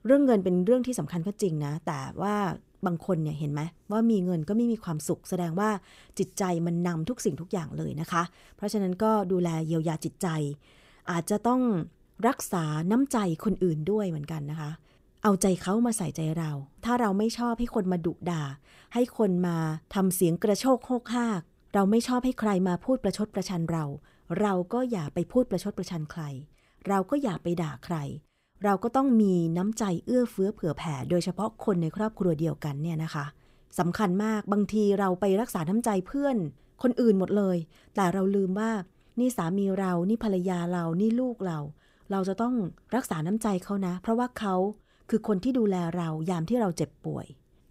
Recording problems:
none

